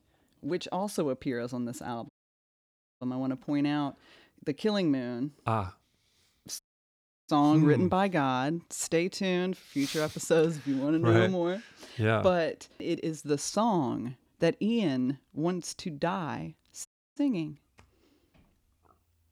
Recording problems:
audio cutting out; at 2 s for 1 s, at 6.5 s for 0.5 s and at 17 s

